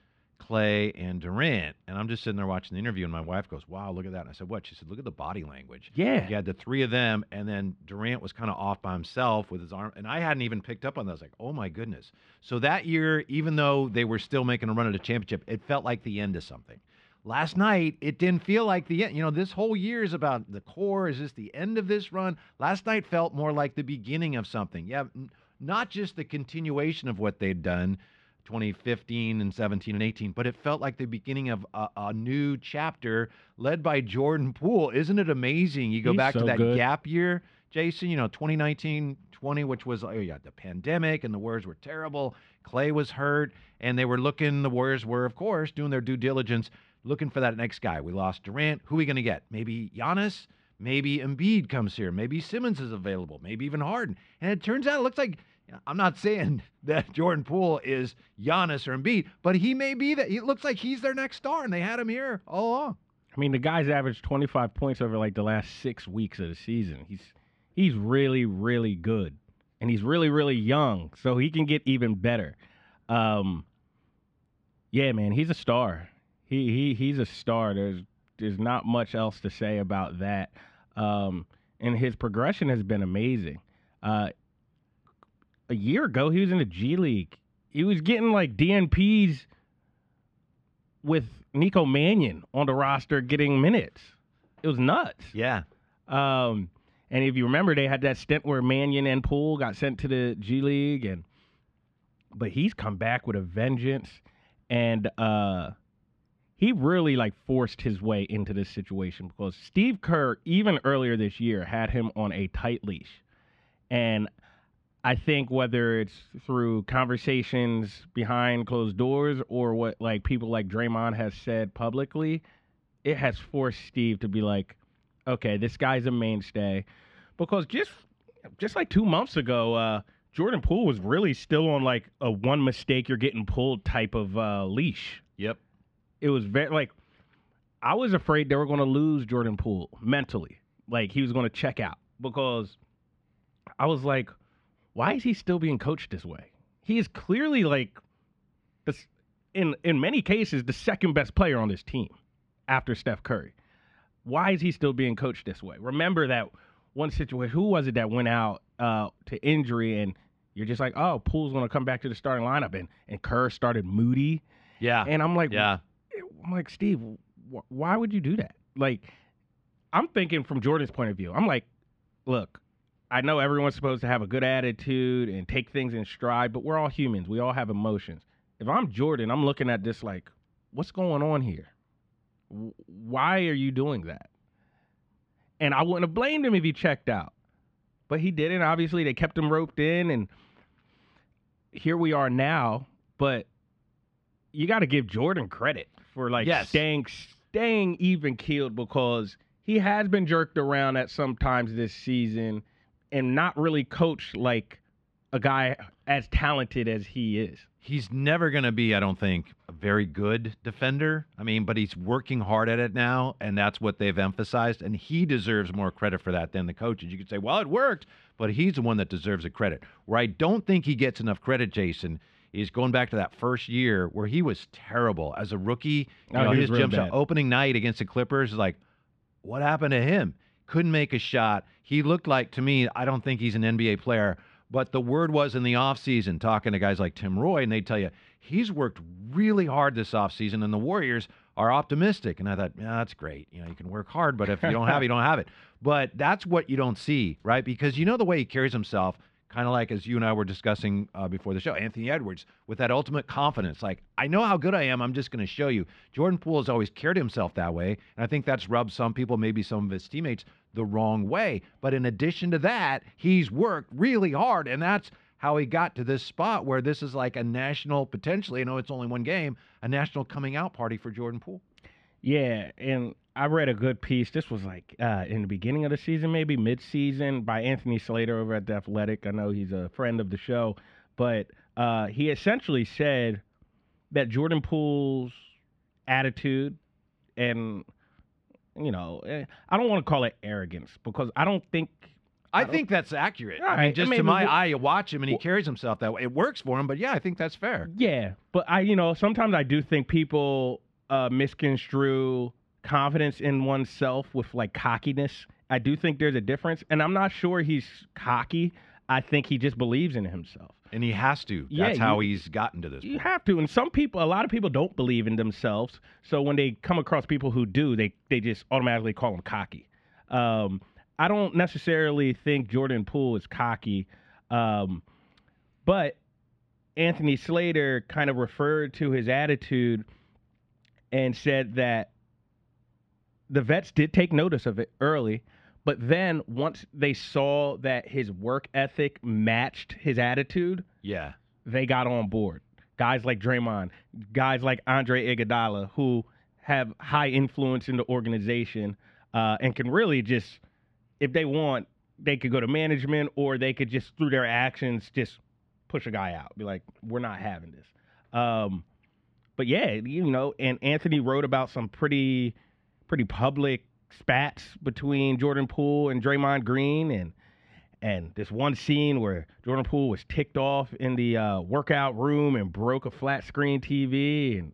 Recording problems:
muffled; slightly; fading above 2.5 kHz

